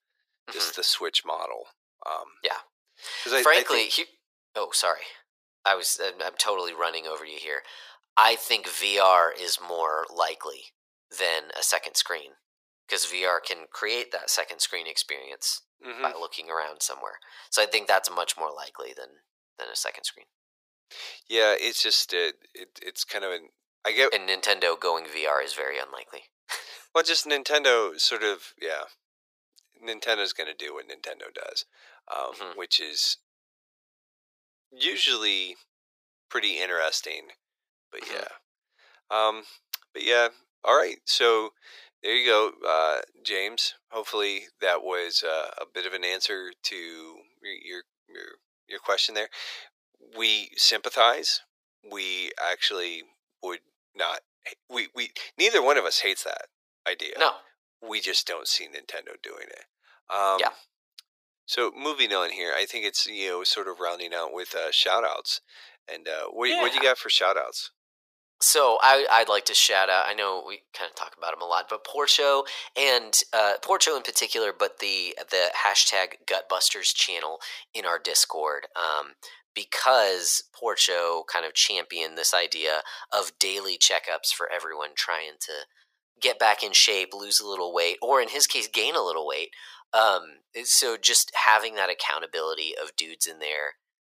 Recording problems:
thin; very; fading below 450 Hz

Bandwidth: 15 kHz